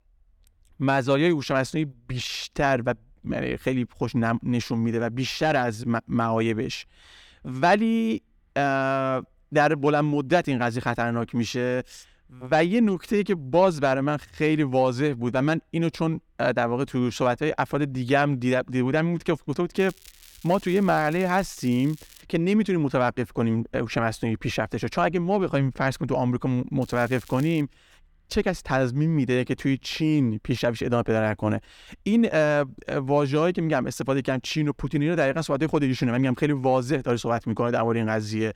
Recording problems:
crackling; faint; from 20 to 22 s and at 27 s; 25 dB below the speech

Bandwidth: 17.5 kHz